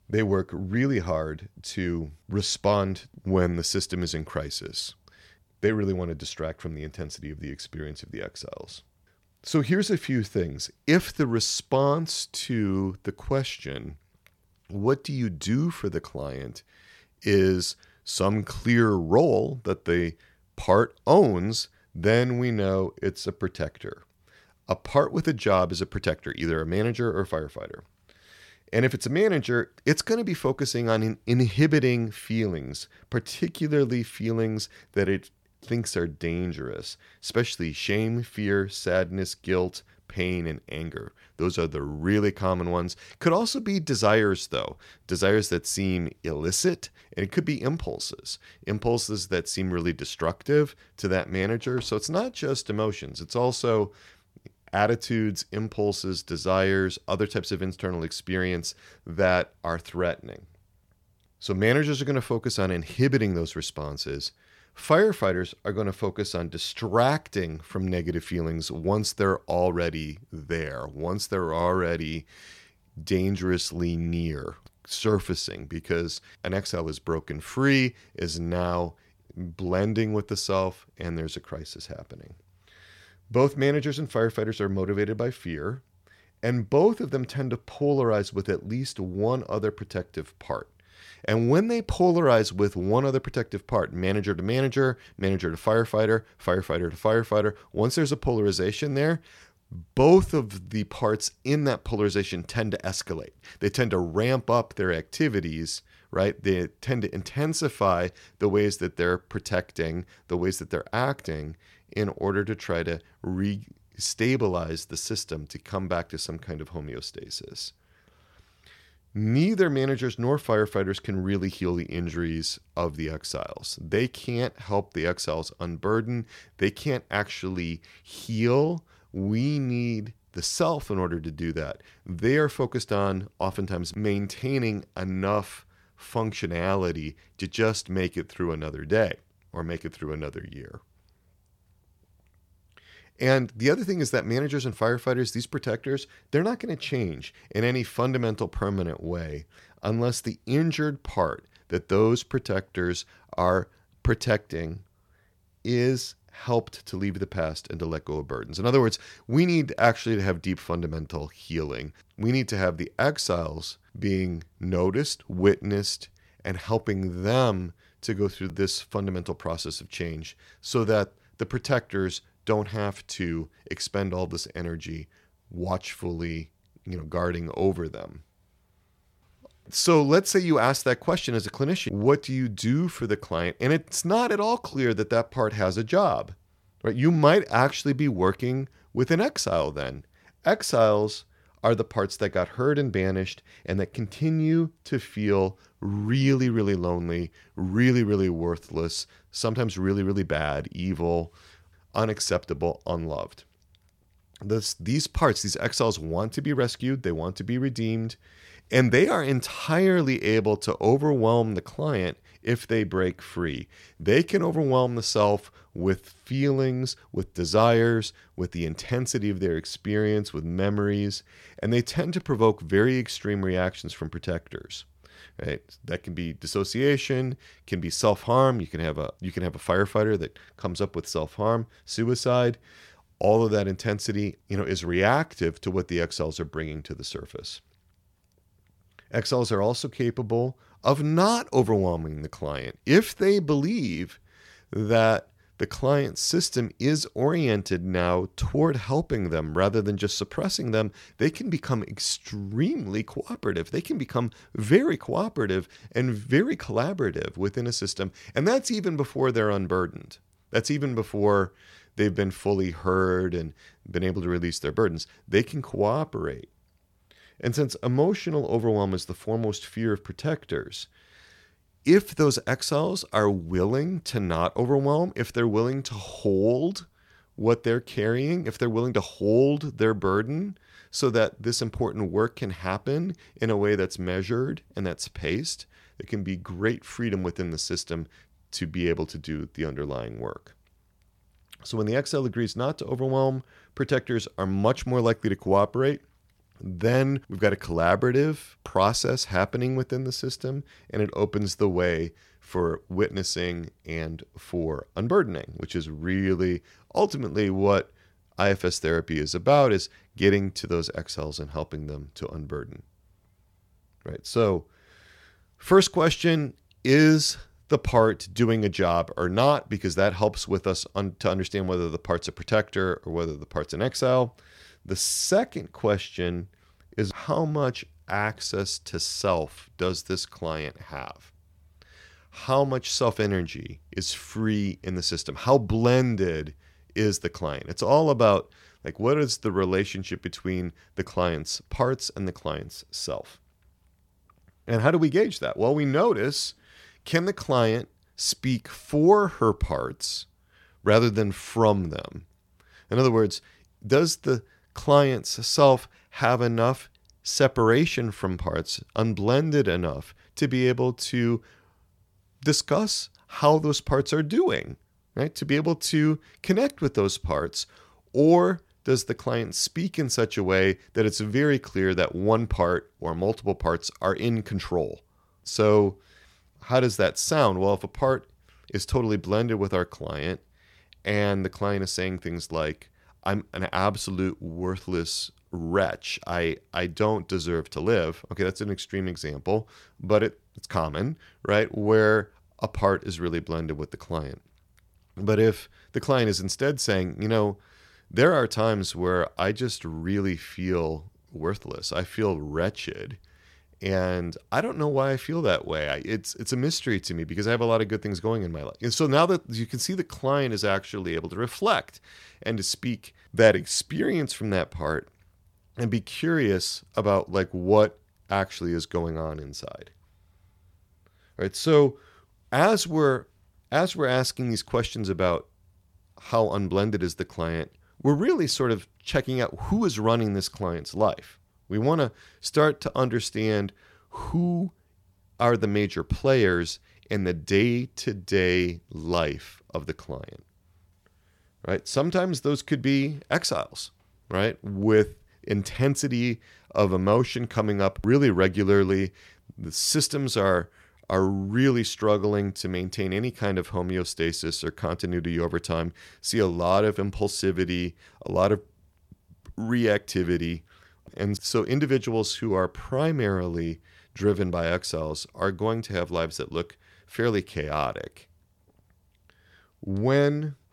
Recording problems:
none

